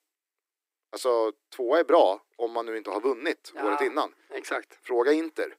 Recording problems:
thin; very; fading below 300 Hz

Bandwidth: 15.5 kHz